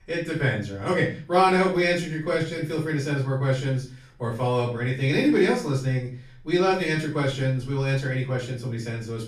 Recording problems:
off-mic speech; far
room echo; slight; dies away in 0.4 s

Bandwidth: 15 kHz